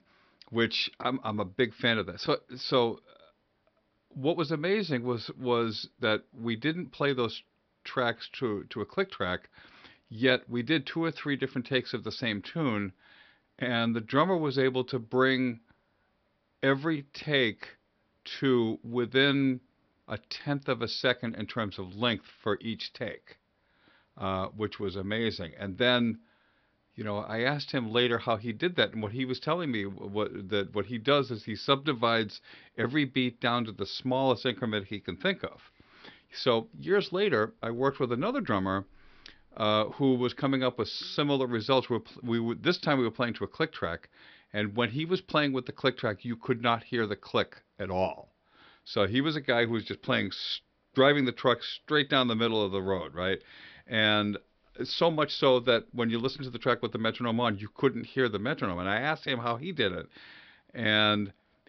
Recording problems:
high frequencies cut off; noticeable; nothing above 5.5 kHz

